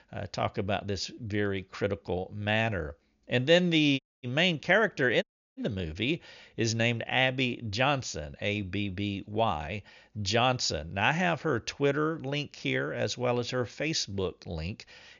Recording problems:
high frequencies cut off; noticeable; nothing above 7 kHz
audio cutting out; at 4 s and at 5 s

